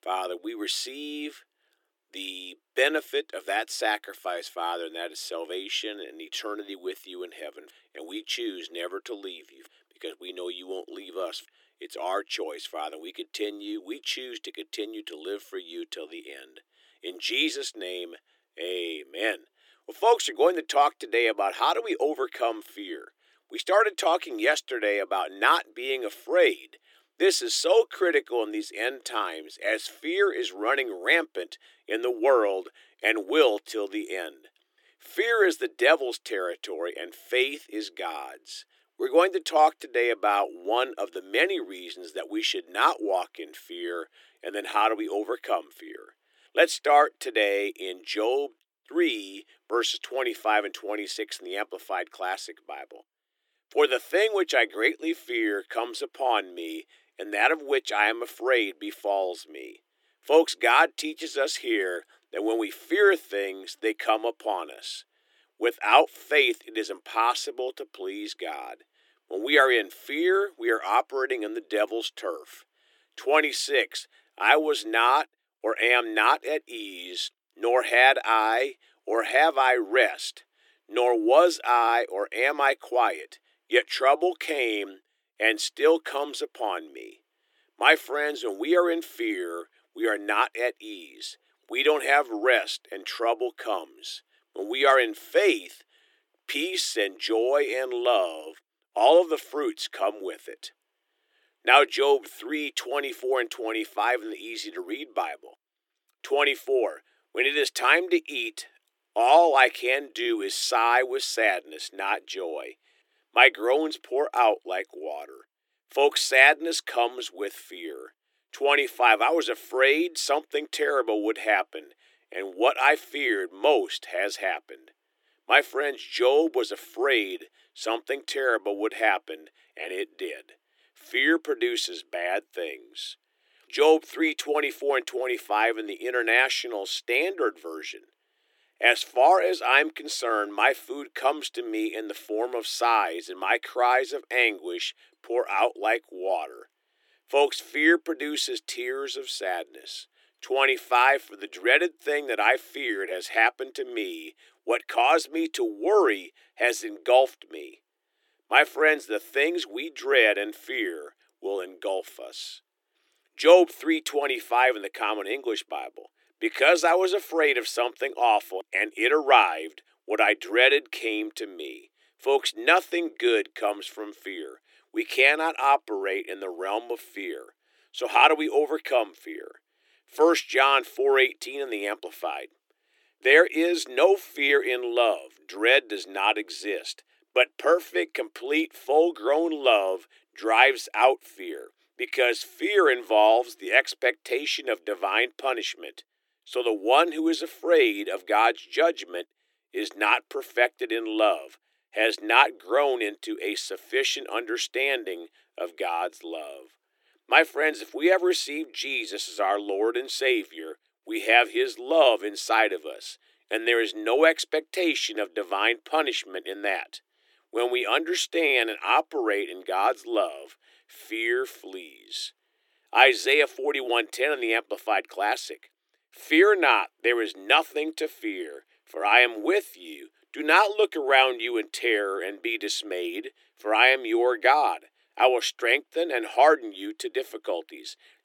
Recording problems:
thin; very; fading below 300 Hz

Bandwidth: 17.5 kHz